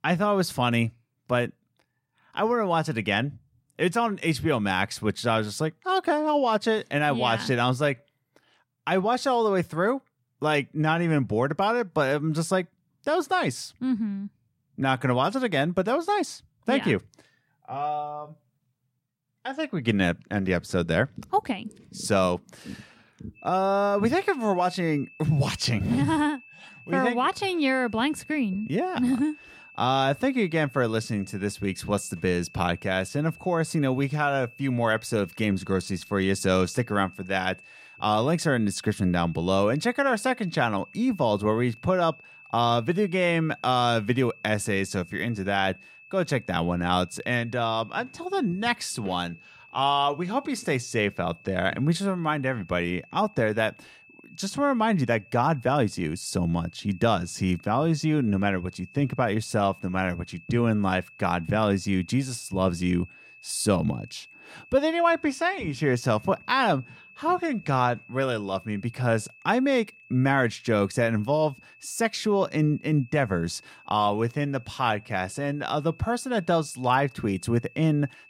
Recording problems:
high-pitched whine; faint; from 23 s on; 2.5 kHz, 25 dB below the speech

